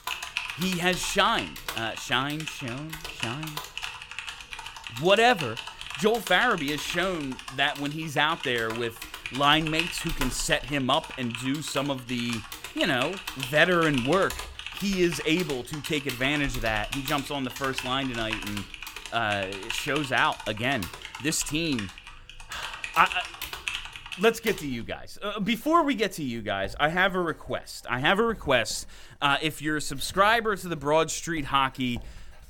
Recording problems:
household noises; loud; throughout; 9 dB below the speech

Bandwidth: 17 kHz